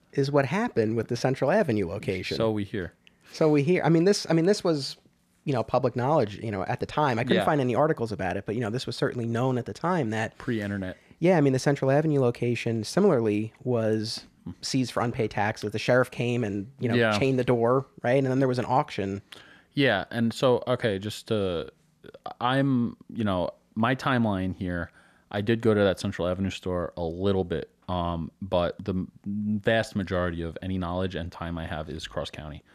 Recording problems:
none

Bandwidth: 14.5 kHz